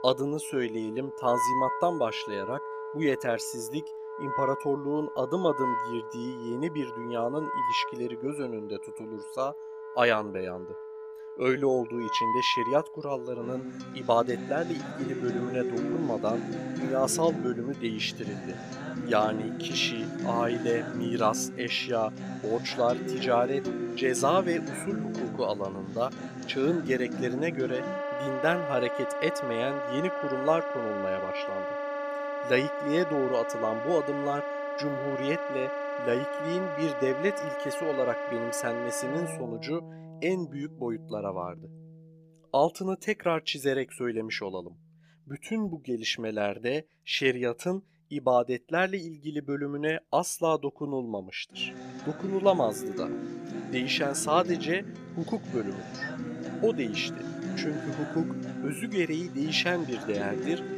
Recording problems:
background music; loud; throughout; 5 dB below the speech

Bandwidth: 15 kHz